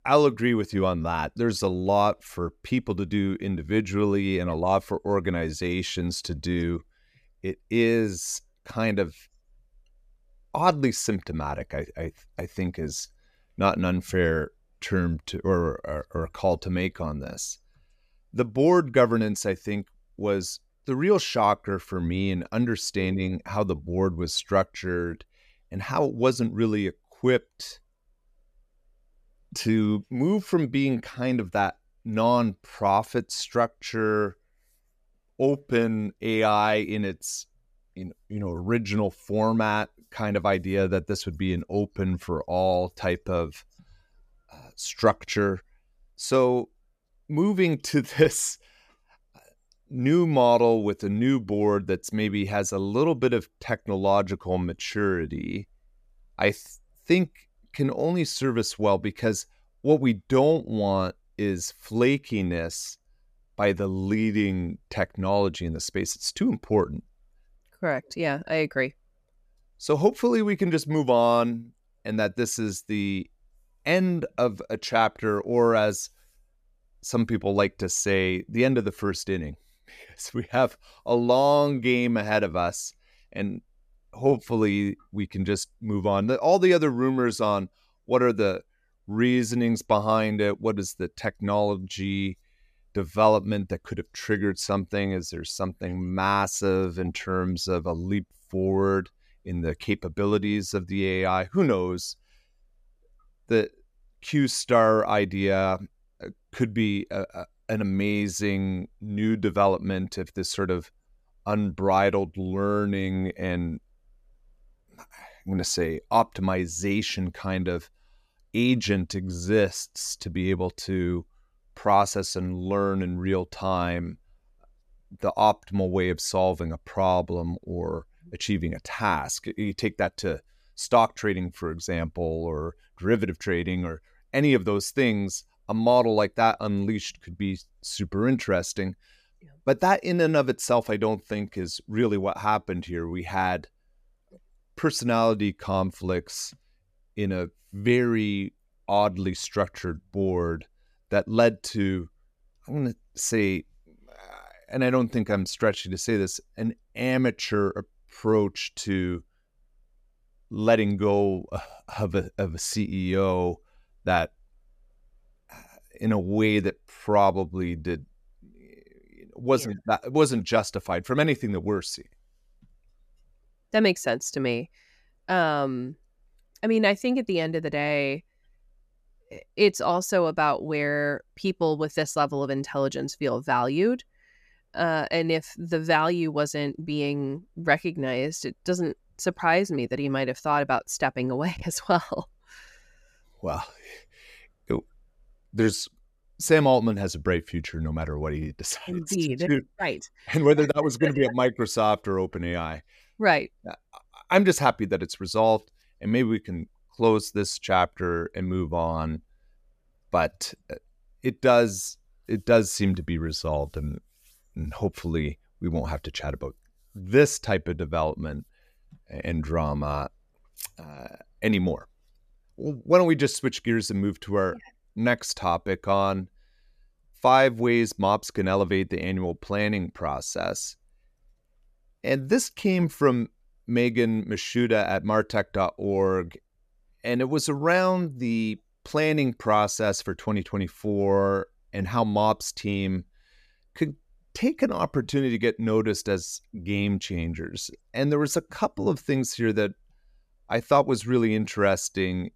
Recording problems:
none

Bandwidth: 14.5 kHz